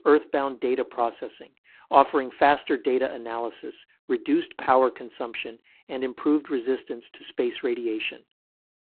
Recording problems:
phone-call audio; poor line

